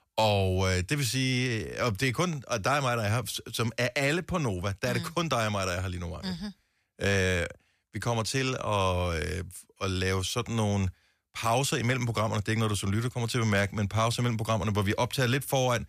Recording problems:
none

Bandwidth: 14.5 kHz